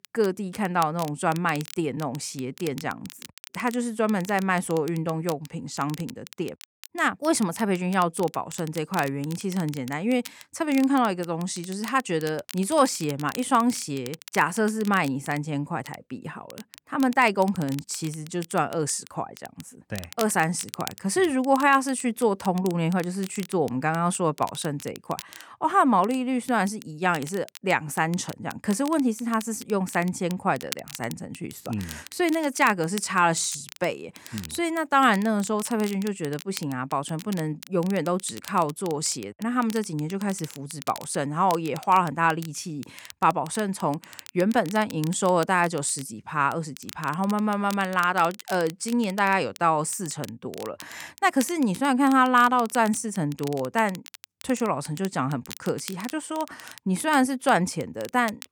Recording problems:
crackle, like an old record; noticeable; 20 dB below the speech

